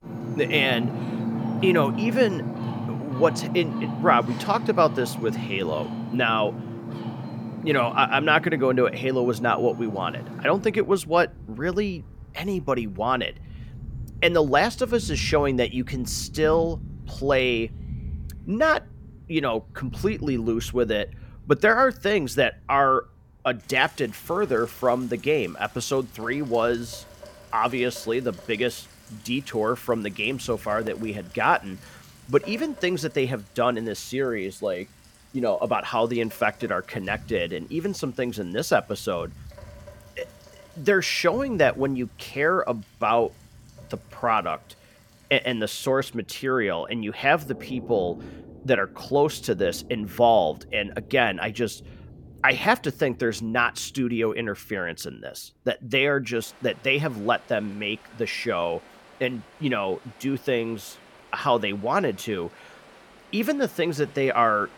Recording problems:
rain or running water; noticeable; throughout; 10 dB below the speech

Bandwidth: 17.5 kHz